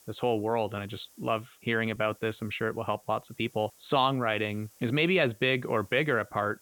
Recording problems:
high frequencies cut off; severe; nothing above 4 kHz
hiss; faint; throughout; 25 dB below the speech

